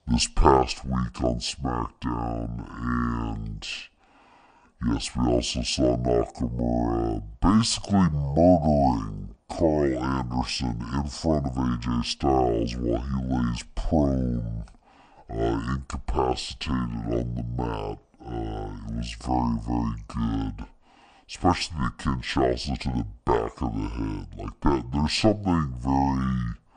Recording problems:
wrong speed and pitch; too slow and too low; 0.6 times normal speed

